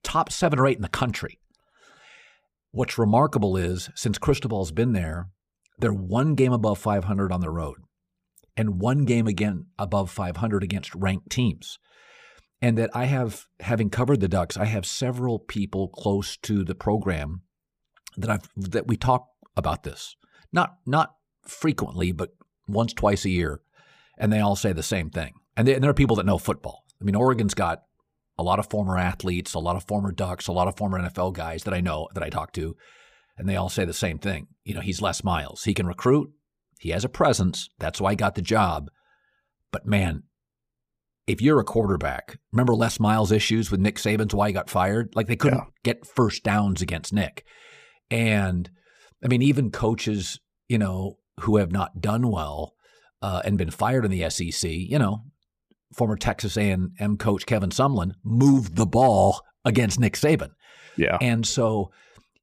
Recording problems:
none

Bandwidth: 15 kHz